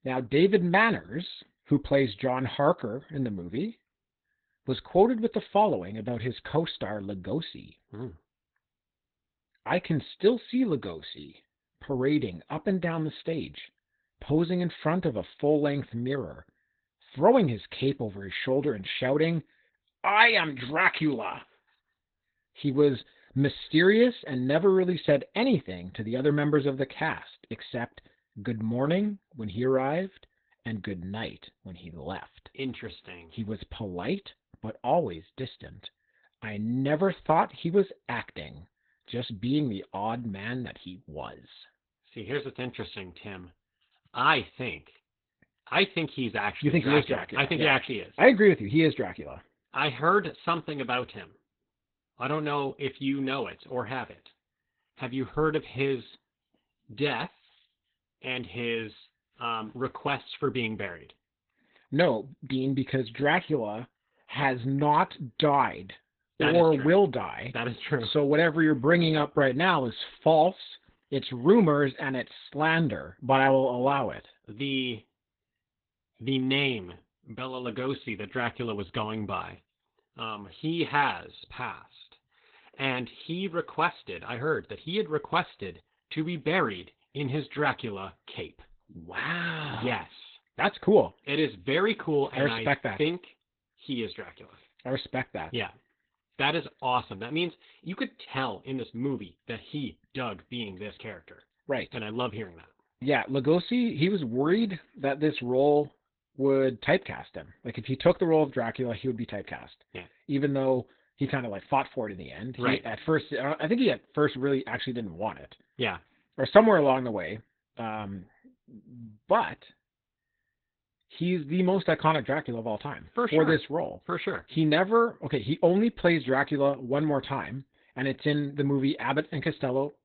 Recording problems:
garbled, watery; badly; nothing above 4 kHz

